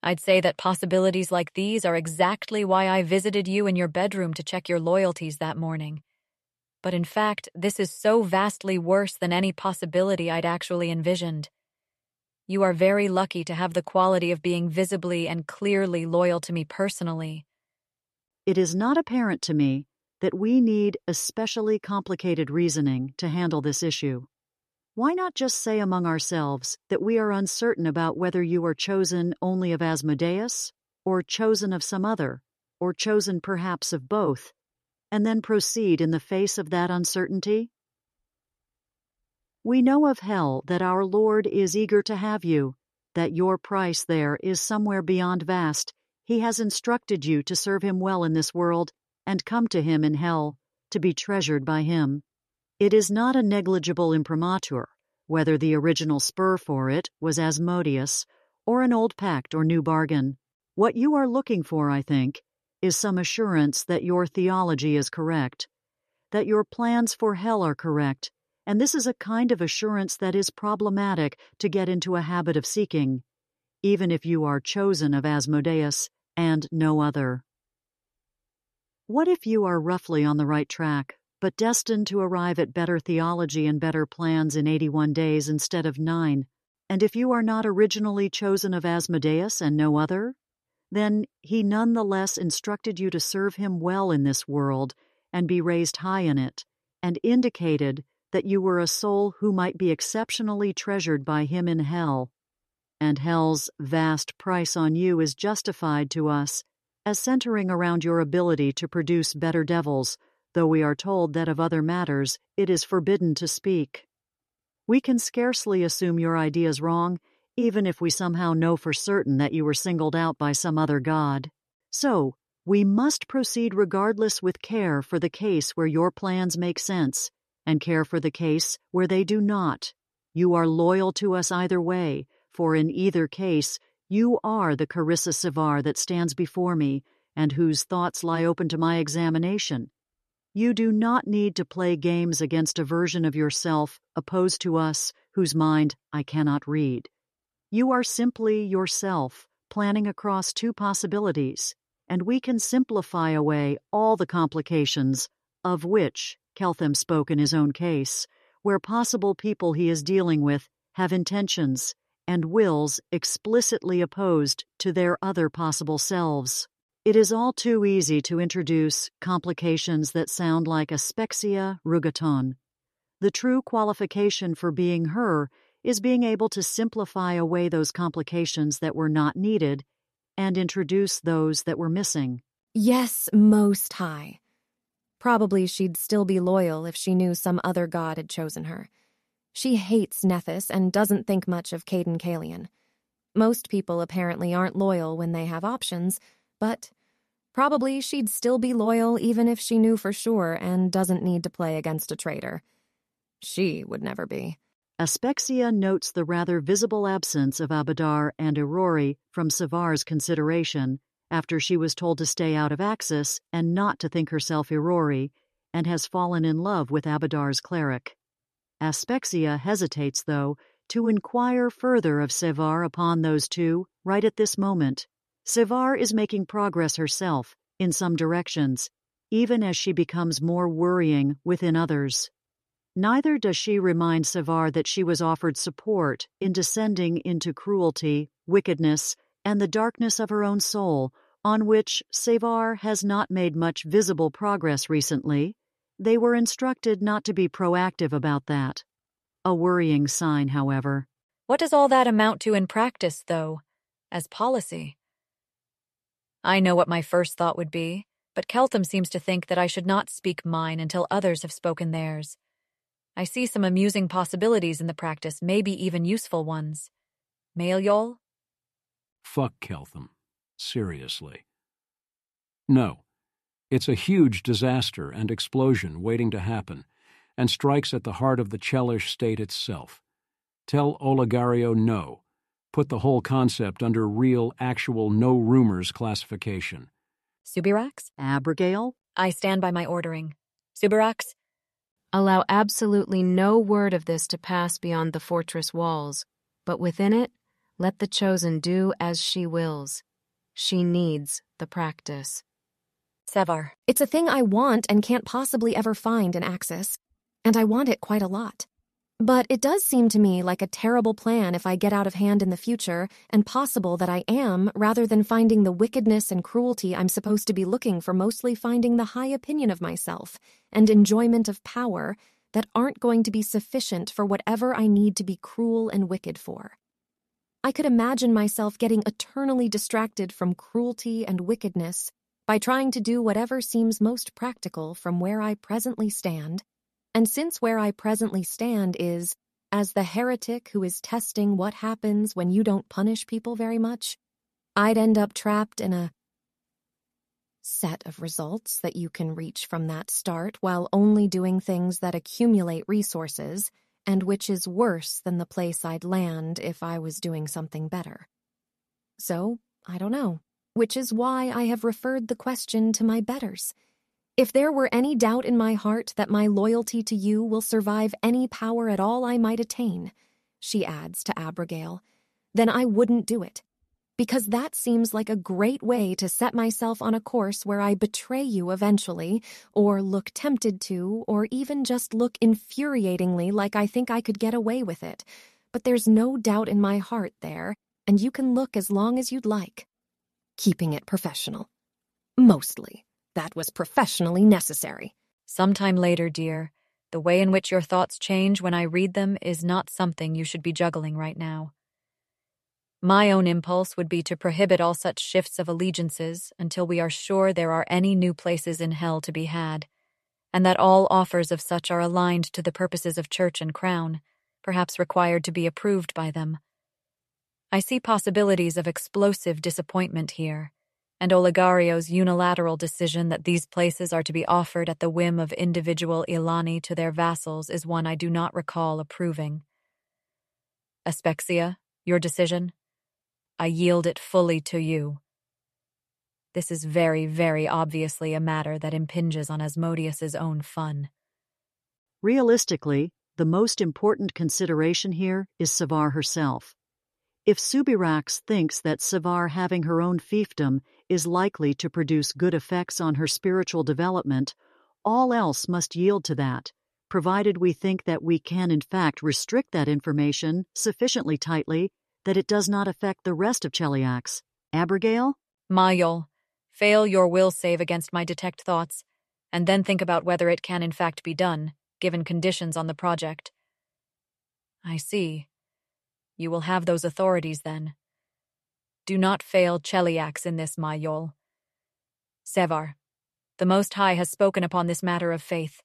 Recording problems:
none

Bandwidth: 13.5 kHz